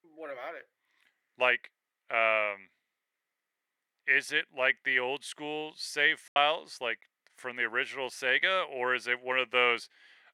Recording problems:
thin; very; fading below 550 Hz
choppy; occasionally; at 6.5 s; 4% of the speech affected

